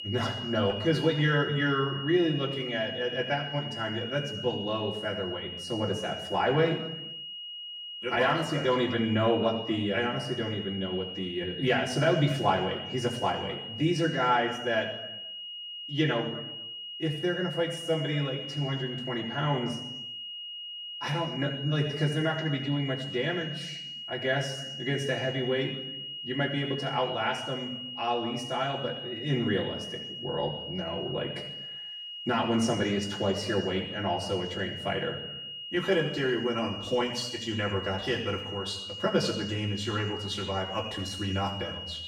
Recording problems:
off-mic speech; far
room echo; noticeable; dies away in 0.9 s
high-pitched whine; loud; throughout; 3 kHz, 7 dB below the speech

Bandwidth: 16.5 kHz